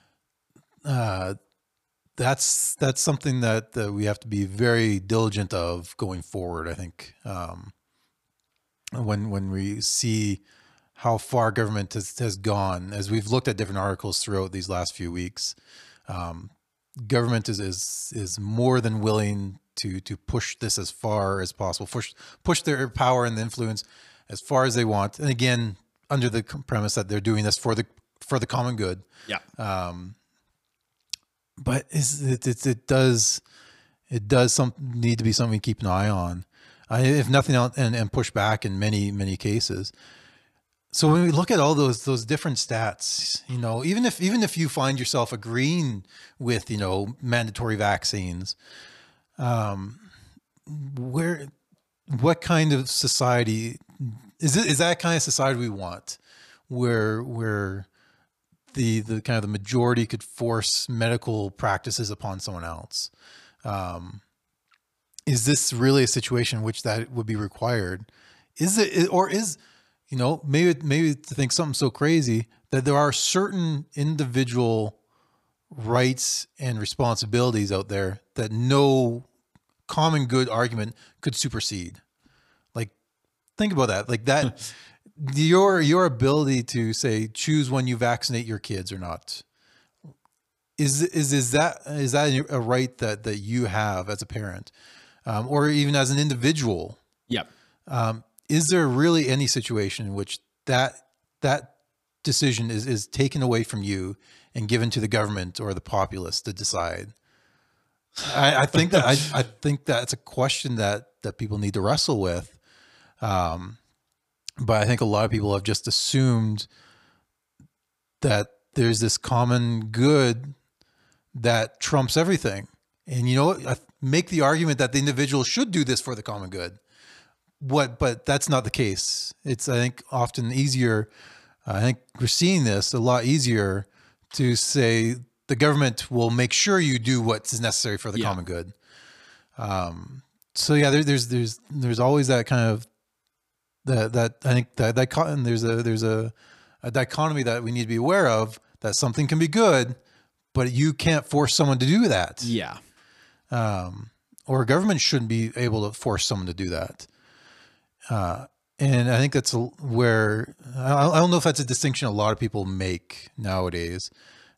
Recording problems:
none

